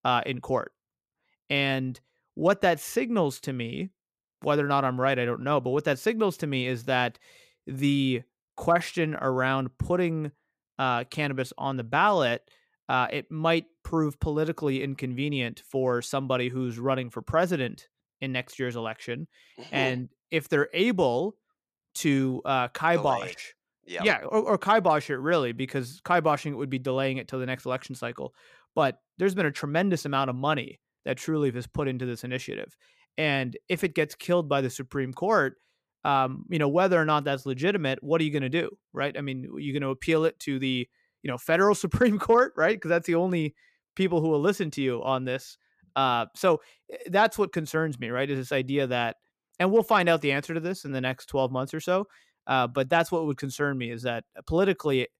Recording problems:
none

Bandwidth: 14.5 kHz